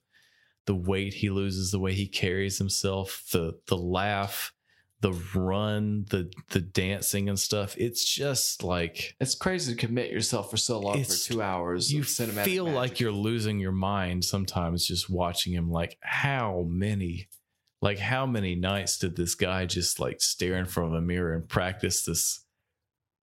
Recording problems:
squashed, flat; somewhat

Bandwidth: 16 kHz